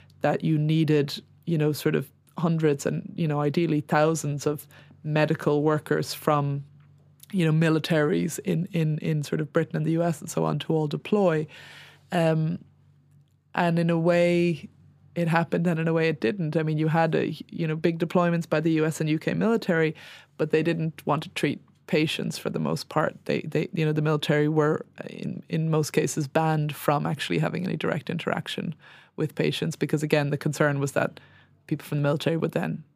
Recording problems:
none

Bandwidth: 15 kHz